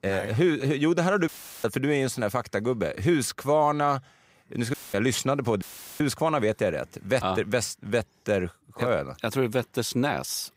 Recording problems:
audio cutting out; filled with static; at 1.5 s, at 4.5 s and at 5.5 s

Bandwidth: 15.5 kHz